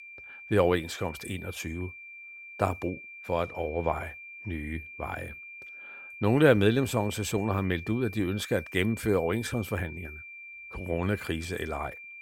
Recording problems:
high-pitched whine; noticeable; throughout; 2.5 kHz, 15 dB below the speech

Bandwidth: 16 kHz